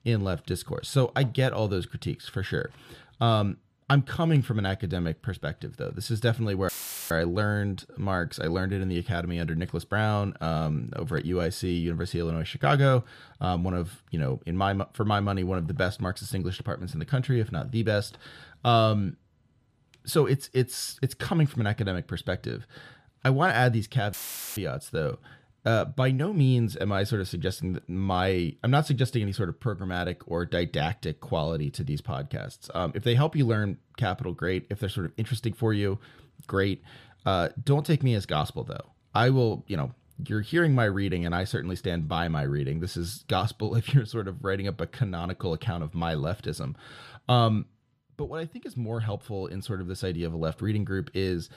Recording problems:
audio cutting out; filled with static; at 6.5 s and at 24 s

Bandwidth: 14.5 kHz